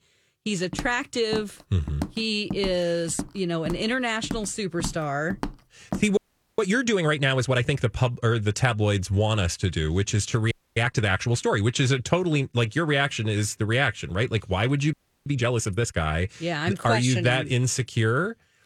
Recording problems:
footsteps; noticeable; from 0.5 to 6 s; peak 9 dB below the speech
audio freezing; at 6 s, at 11 s and at 15 s

